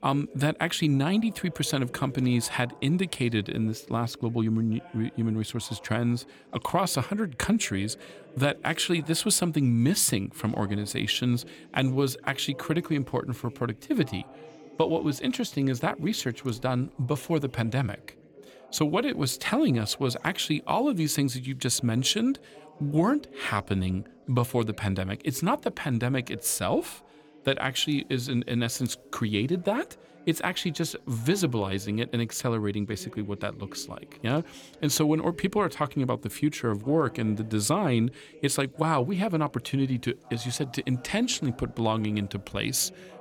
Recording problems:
background chatter; faint; throughout; 2 voices, 20 dB below the speech

